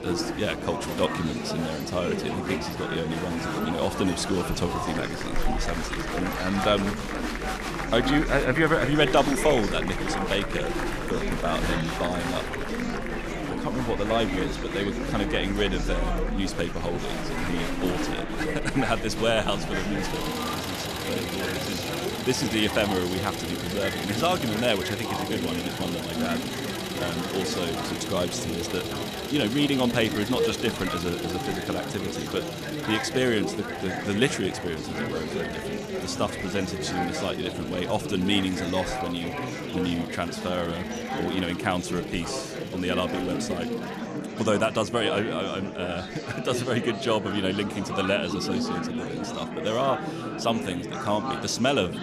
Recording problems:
traffic noise; loud; throughout; 9 dB below the speech
murmuring crowd; loud; throughout; 3 dB below the speech

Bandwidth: 14 kHz